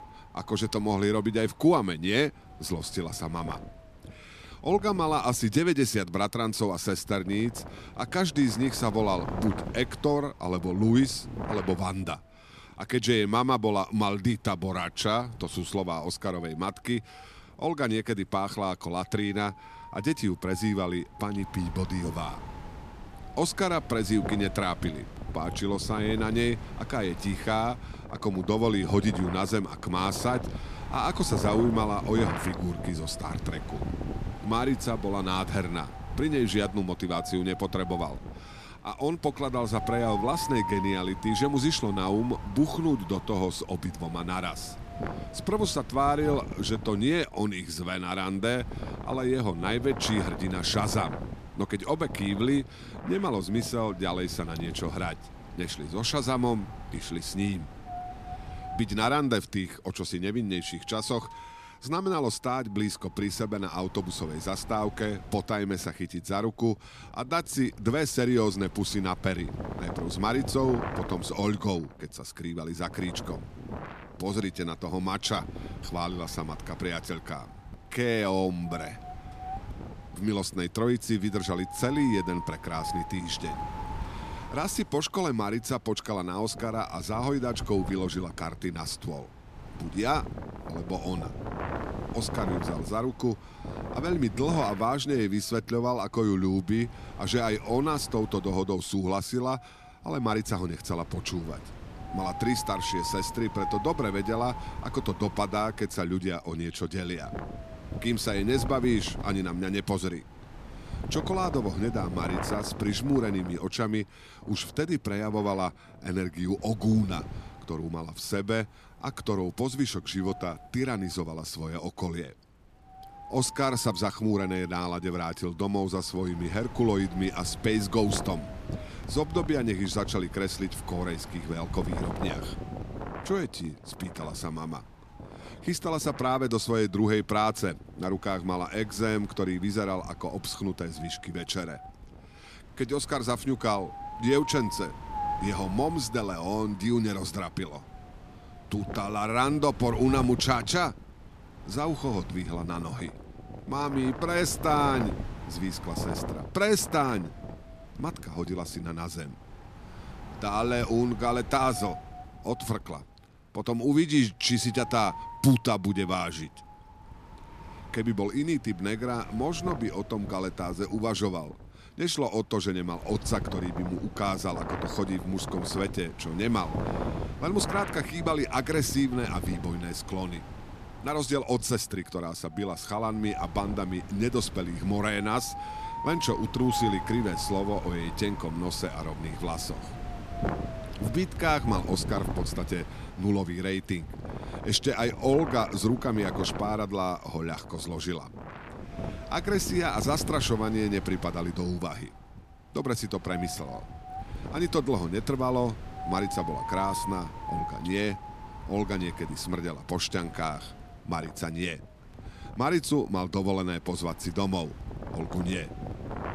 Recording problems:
wind noise on the microphone; heavy; 9 dB below the speech

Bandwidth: 14.5 kHz